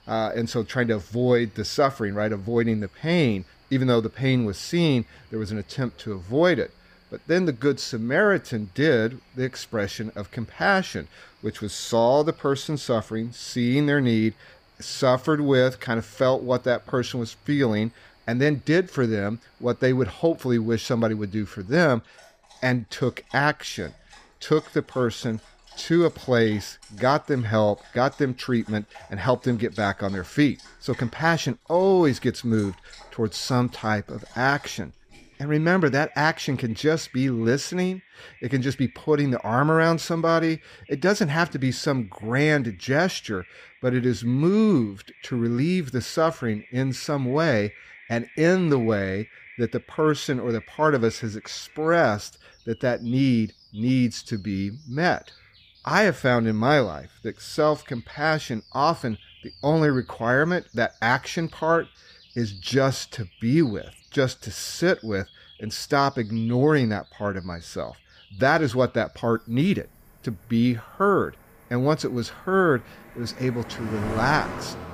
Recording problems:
animal sounds; faint; throughout; 25 dB below the speech

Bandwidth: 15 kHz